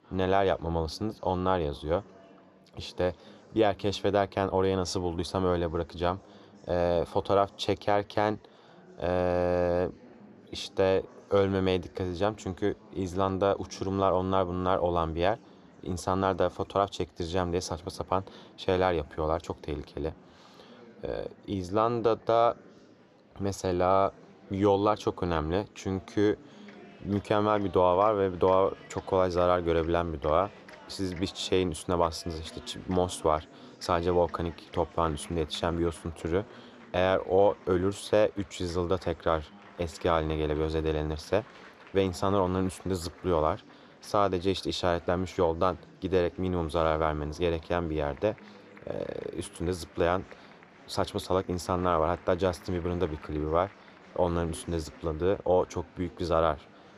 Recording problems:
murmuring crowd; faint; throughout; 25 dB below the speech

